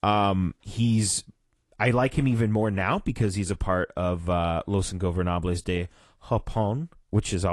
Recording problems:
garbled, watery; slightly
abrupt cut into speech; at the end

